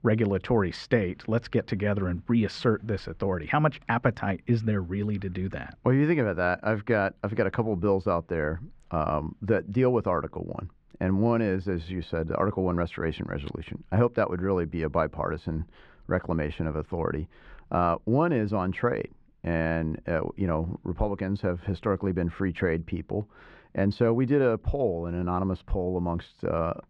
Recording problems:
muffled; slightly; fading above 2 kHz

